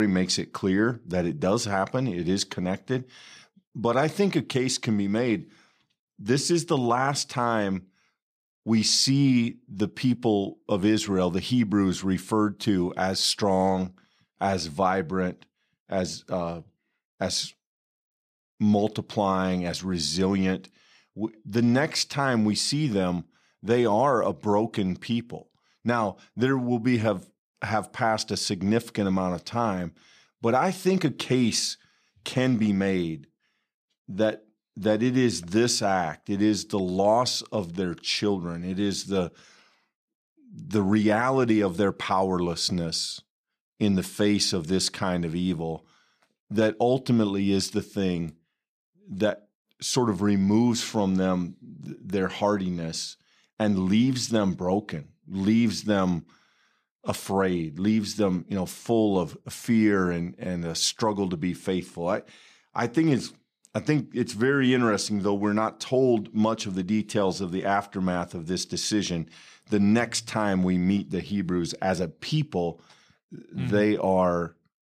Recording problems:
abrupt cut into speech; at the start

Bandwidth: 14.5 kHz